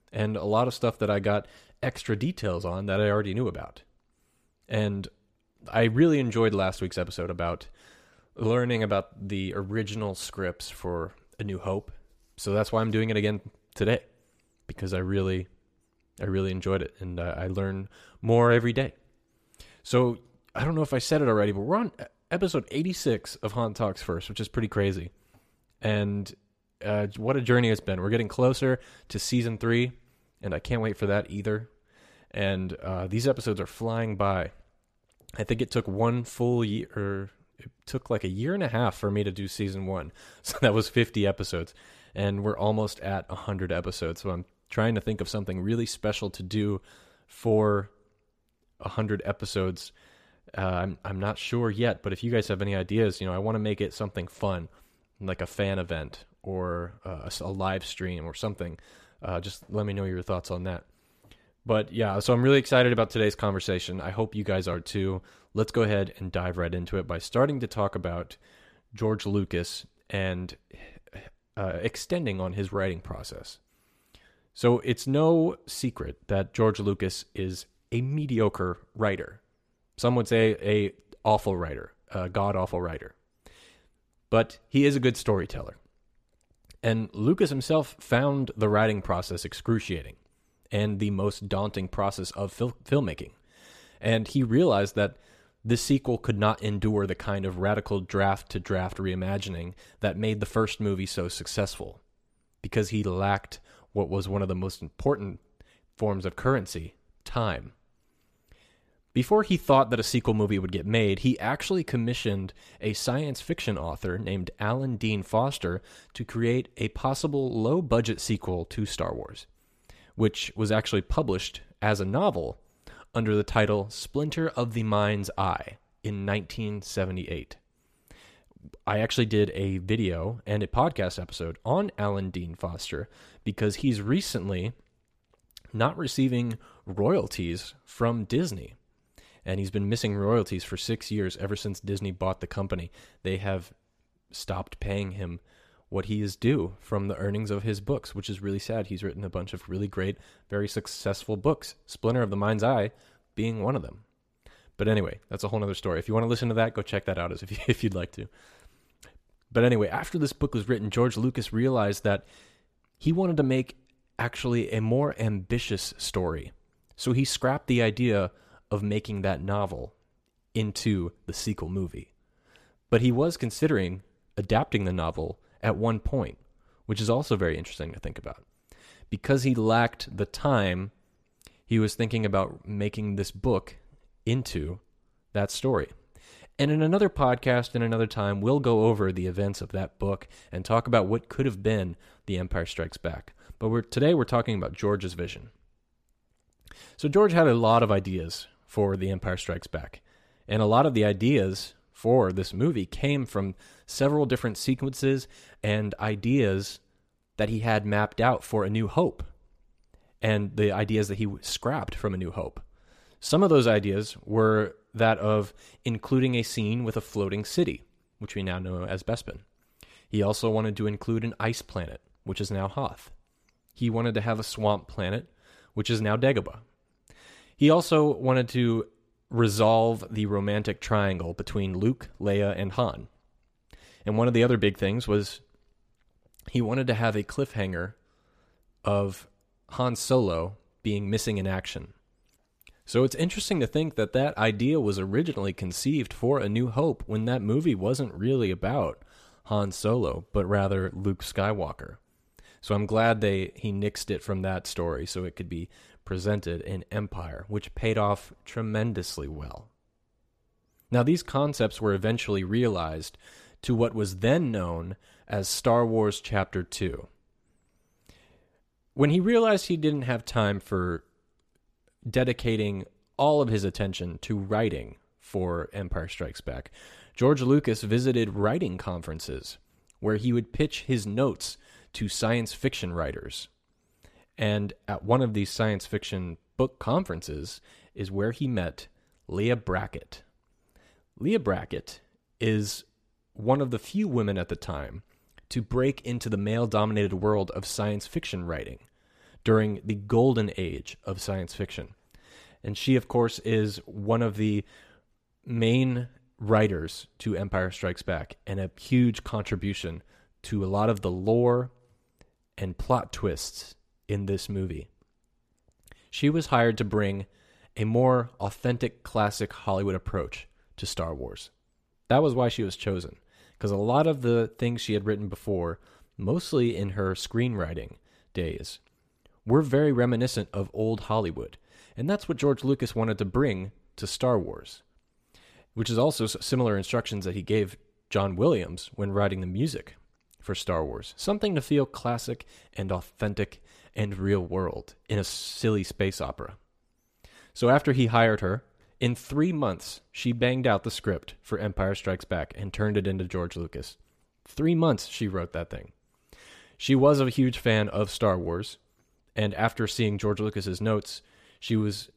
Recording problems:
none

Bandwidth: 14.5 kHz